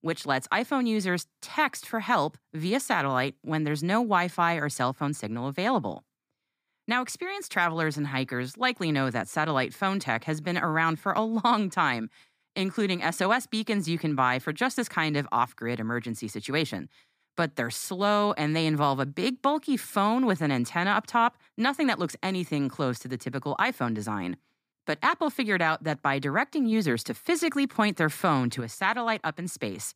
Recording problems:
none

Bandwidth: 15 kHz